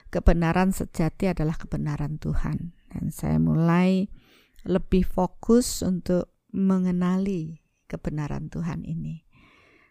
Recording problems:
none

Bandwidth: 15 kHz